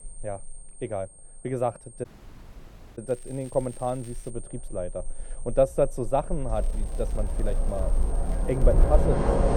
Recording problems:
muffled; very; fading above 1.5 kHz
rain or running water; very loud; throughout; 2 dB above the speech
high-pitched whine; noticeable; throughout; 8.5 kHz, 15 dB below the speech
crackling; faint; from 3 to 4.5 s and from 6.5 to 9 s; 25 dB below the speech
audio cutting out; at 2 s for 1 s

